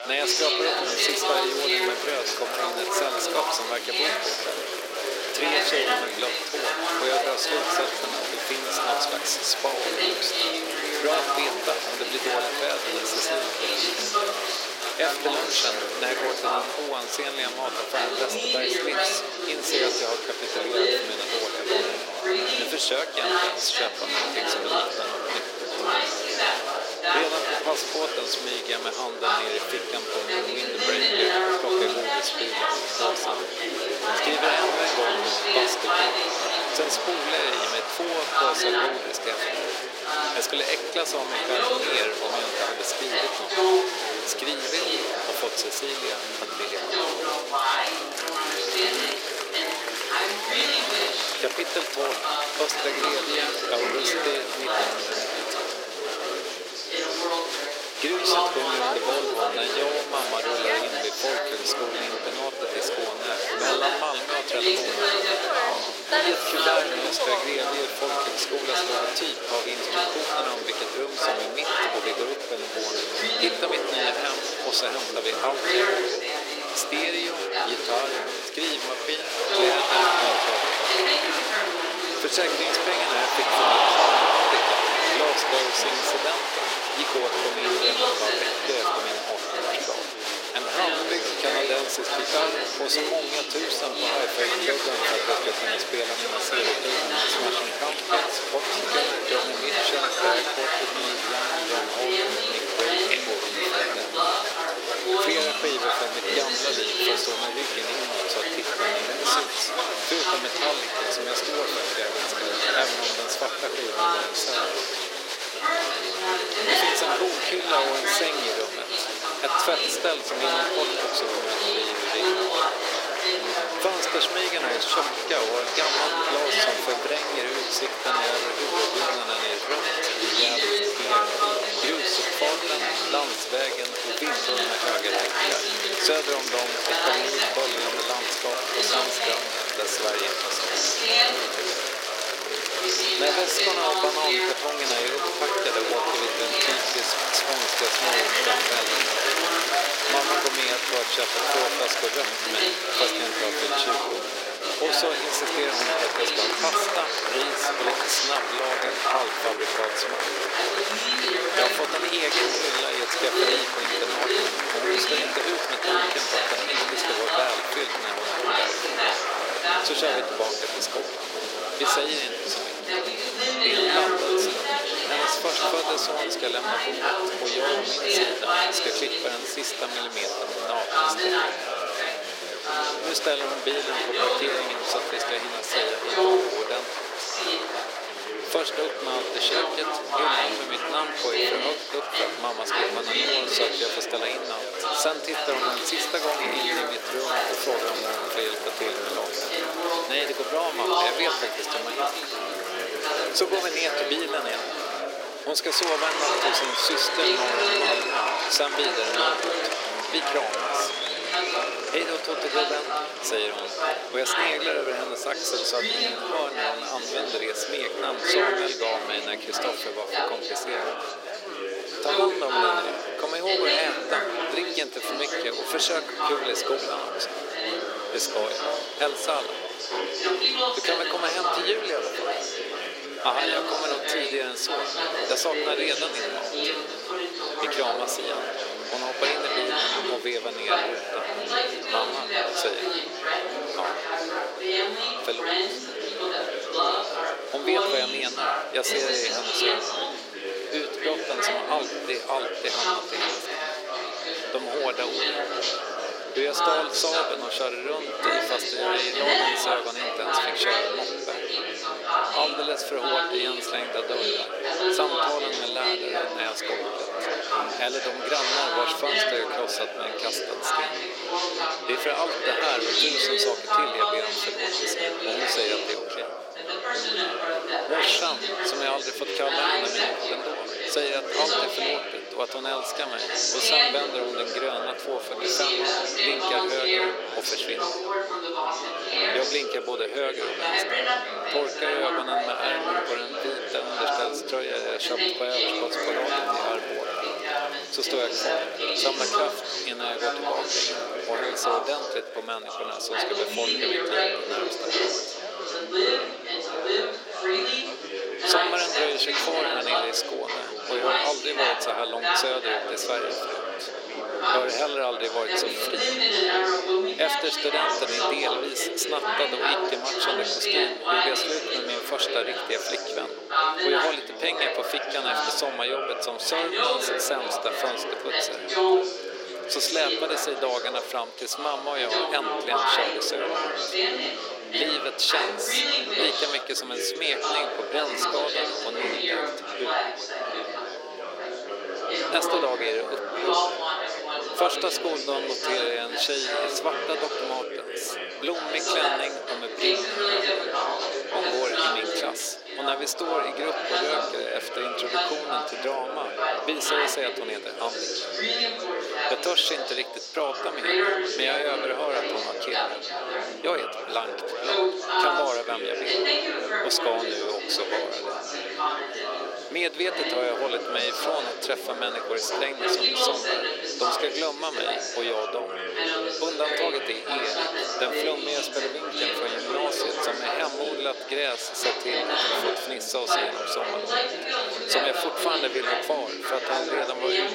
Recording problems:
thin; very; fading below 350 Hz
chatter from many people; very loud; throughout; 4 dB above the speech
high-pitched whine; faint; throughout; 4.5 kHz, 30 dB below the speech

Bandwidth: 16 kHz